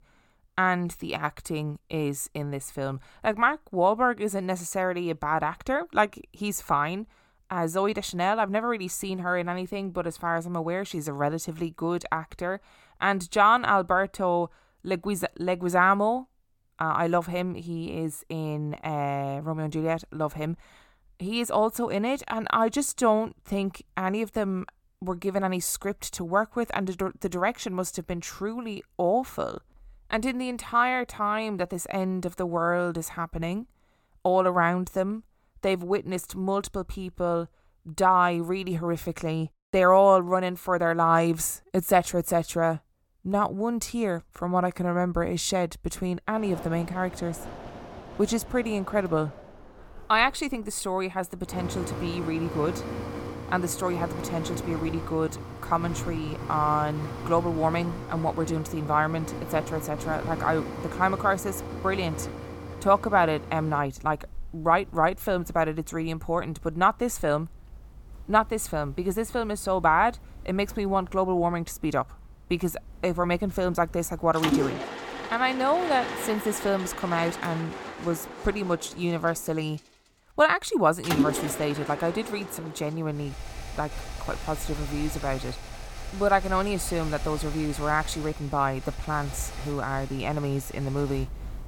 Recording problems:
machinery noise; loud; from 46 s on; 10 dB below the speech

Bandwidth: 18 kHz